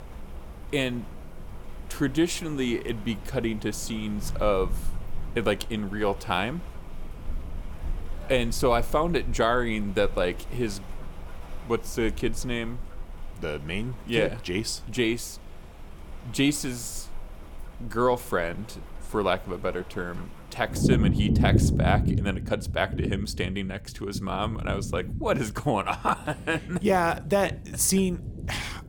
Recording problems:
rain or running water; loud; throughout; 5 dB below the speech

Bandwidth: 18 kHz